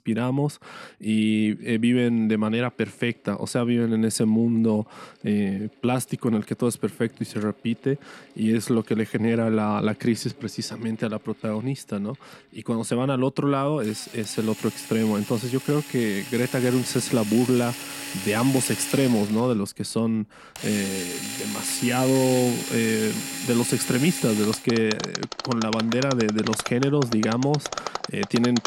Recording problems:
machinery noise; loud; throughout; 7 dB below the speech

